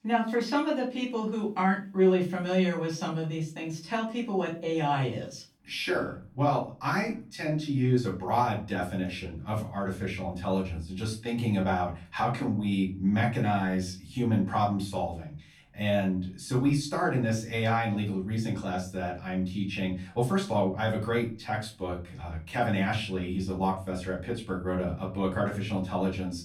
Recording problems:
off-mic speech; far
room echo; slight; dies away in 0.3 s

